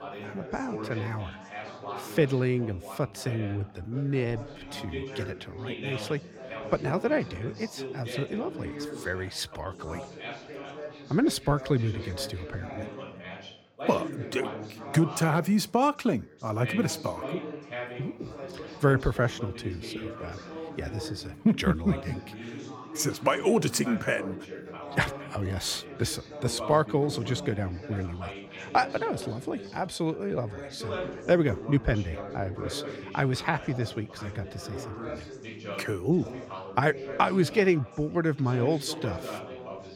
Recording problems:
background chatter; noticeable; throughout; 4 voices, 10 dB below the speech

